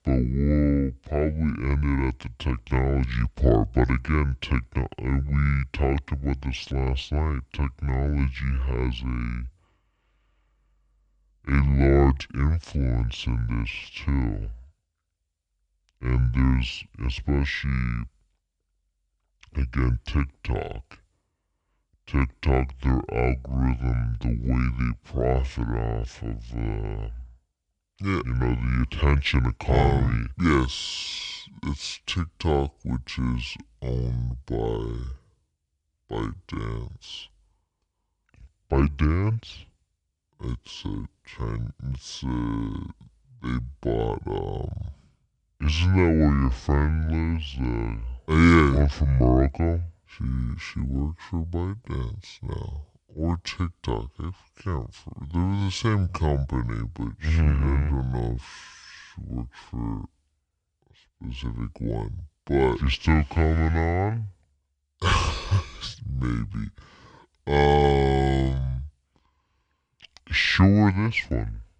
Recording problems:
wrong speed and pitch; too slow and too low; 0.6 times normal speed

